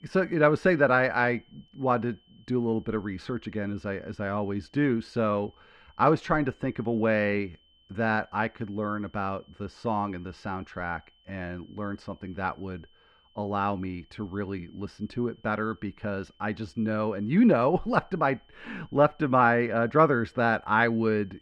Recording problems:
muffled; very; fading above 2 kHz
high-pitched whine; faint; throughout; 3 kHz, 35 dB below the speech

